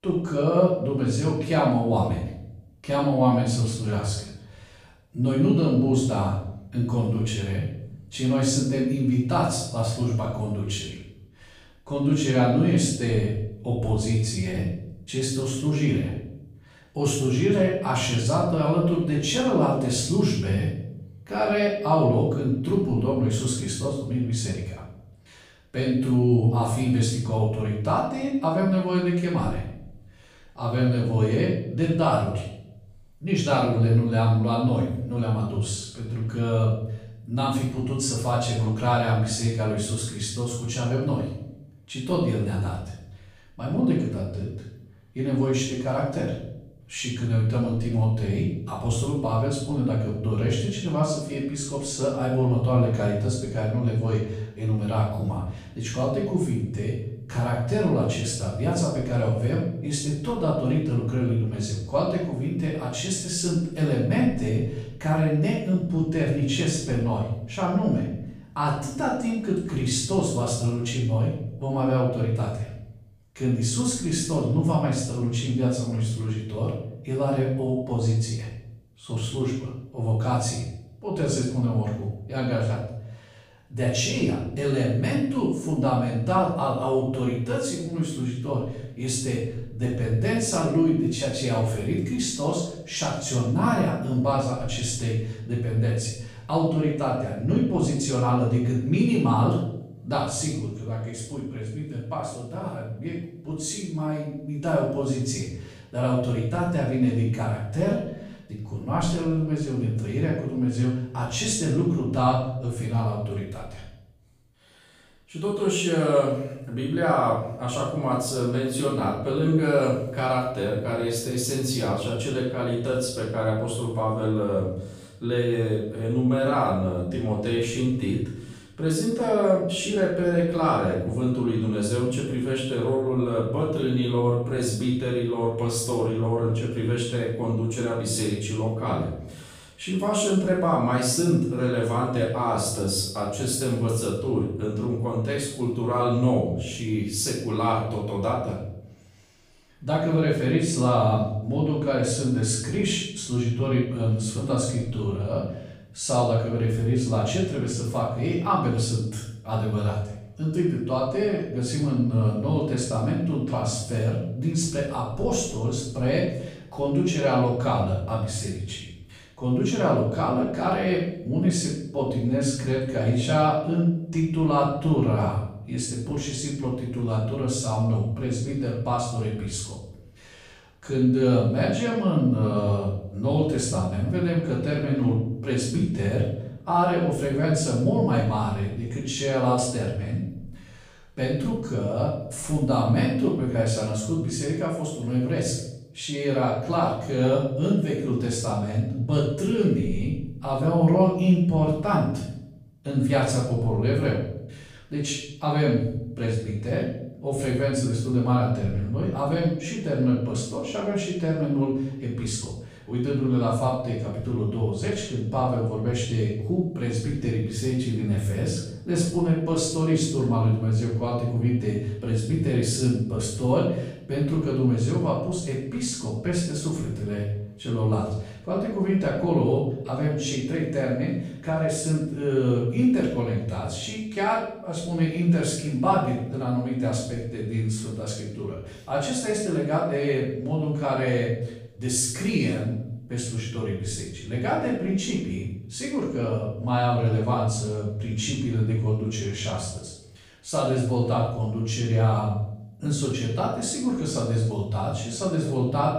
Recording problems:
off-mic speech; far
room echo; noticeable; dies away in 0.7 s

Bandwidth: 15 kHz